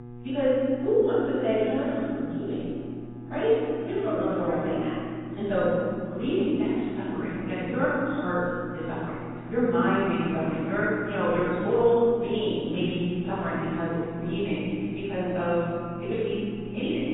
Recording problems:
room echo; strong; dies away in 2.4 s
off-mic speech; far
garbled, watery; badly; nothing above 3.5 kHz
wrong speed, natural pitch; too fast; 1.6 times normal speed
electrical hum; noticeable; throughout; 60 Hz, 20 dB below the speech

